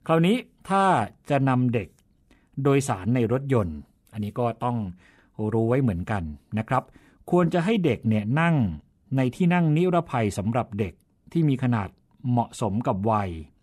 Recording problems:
none

